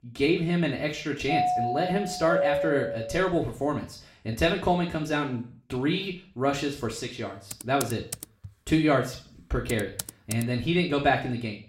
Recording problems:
room echo; slight; dies away in 0.4 s
off-mic speech; somewhat distant
doorbell; loud; from 1.5 to 3.5 s; peak 2 dB above the speech
keyboard typing; noticeable; from 7.5 to 10 s; peak 7 dB below the speech

